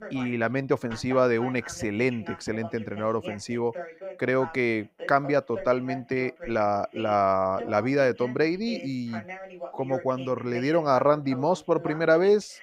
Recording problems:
voice in the background; noticeable; throughout; 15 dB below the speech

